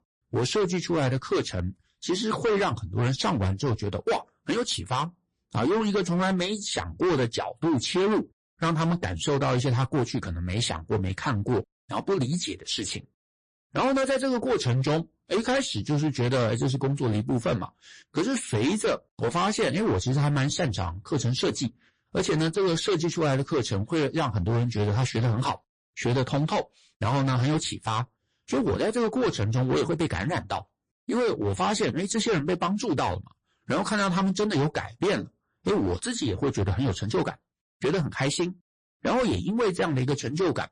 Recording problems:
distortion; heavy; 16% of the sound clipped
garbled, watery; slightly

